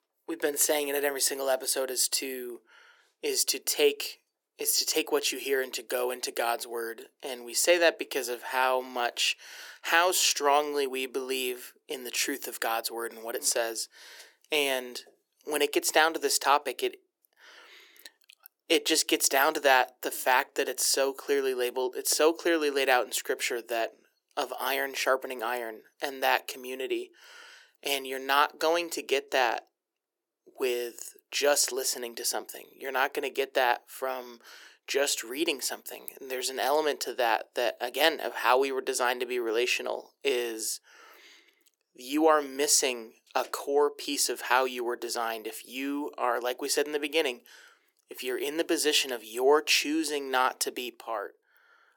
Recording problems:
thin; very; fading below 350 Hz

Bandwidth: 18 kHz